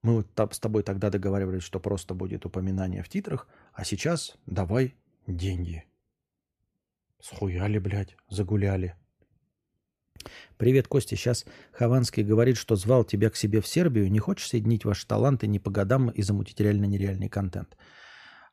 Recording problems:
none

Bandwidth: 14.5 kHz